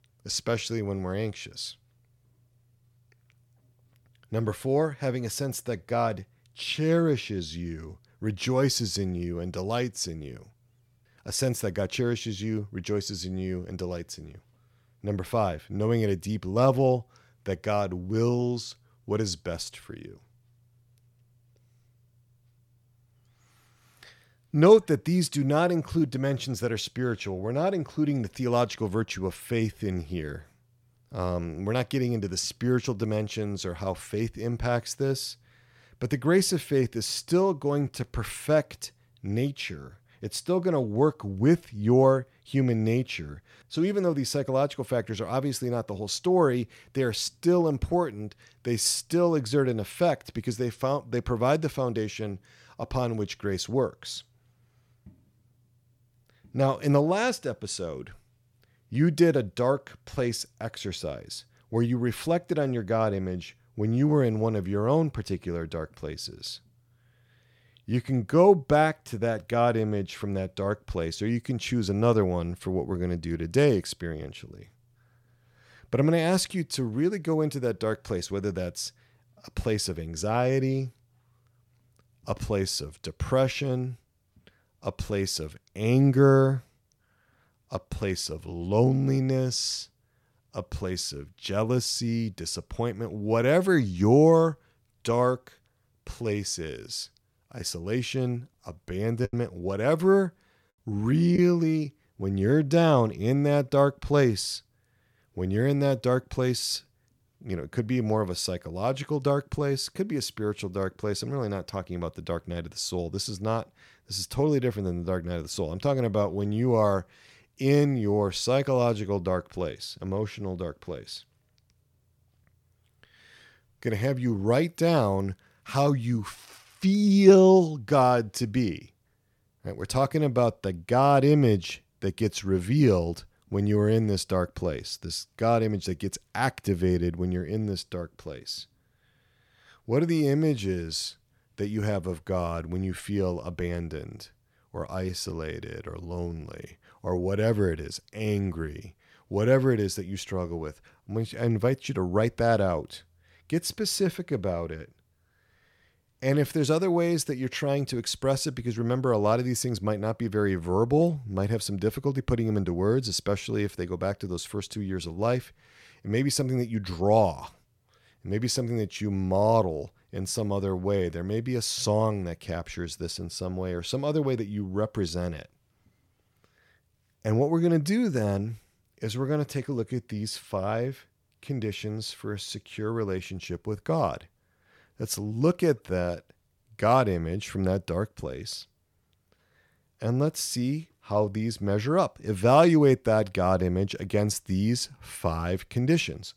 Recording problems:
choppy; very; from 1:39 to 1:41; 5% of the speech affected

